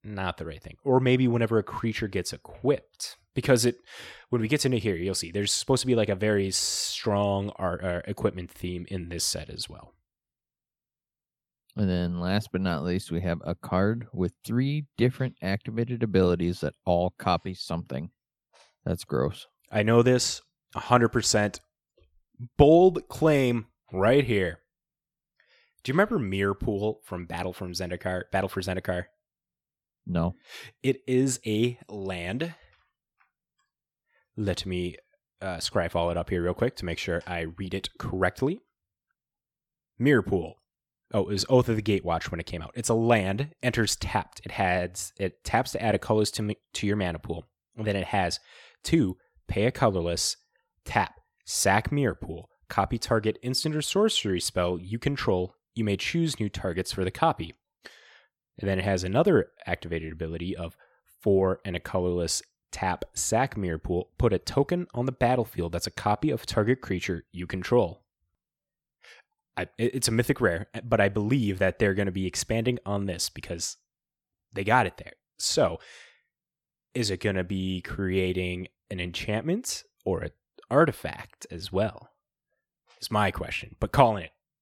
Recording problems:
none

